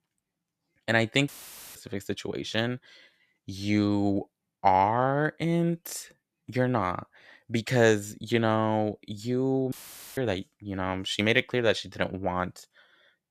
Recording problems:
audio cutting out; filled with static; at 1.5 s and at 9.5 s

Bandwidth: 14.5 kHz